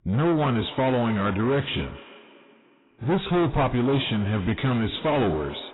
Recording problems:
distortion; heavy; 7 dB below the speech
garbled, watery; badly; nothing above 4 kHz
echo of what is said; faint; throughout; 270 ms later, 20 dB below the speech

